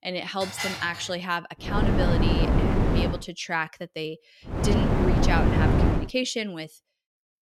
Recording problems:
wind noise on the microphone; heavy; from 1.5 to 3 s and from 4.5 to 6 s; 1 dB above the speech
clattering dishes; loud; at 0.5 s; peak level with the speech

